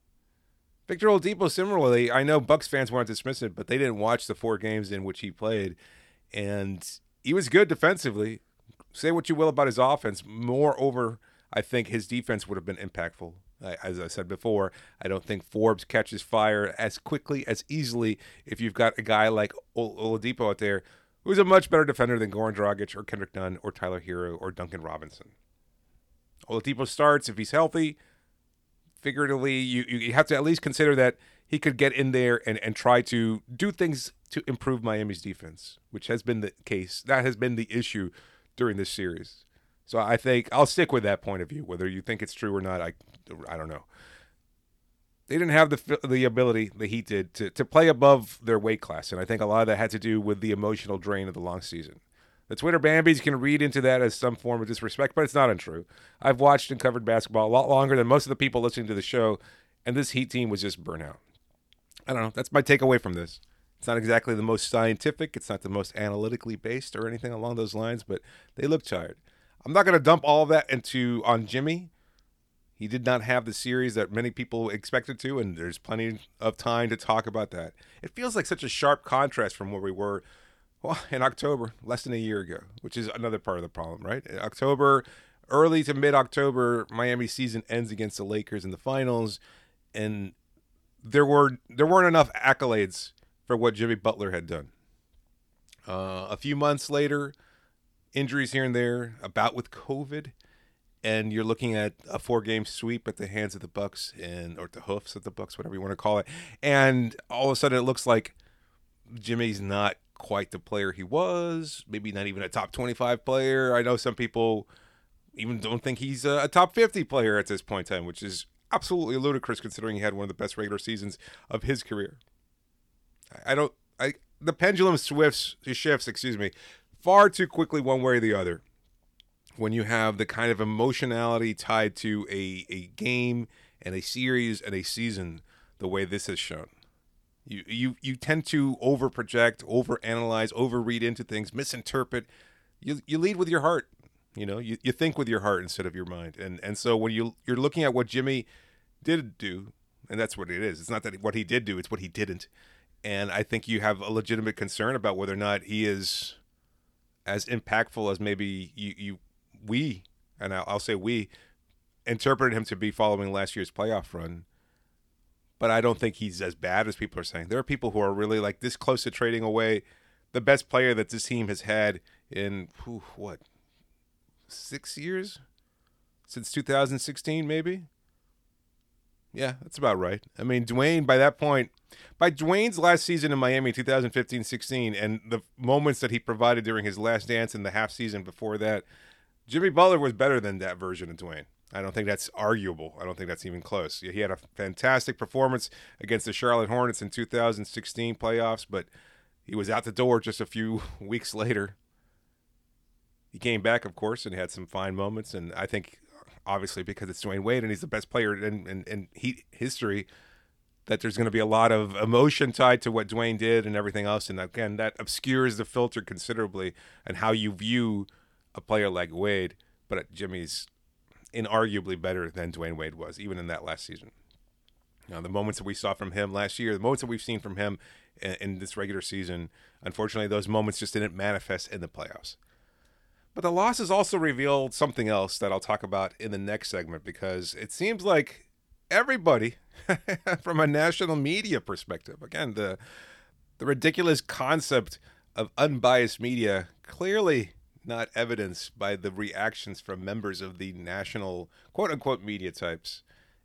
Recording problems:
none

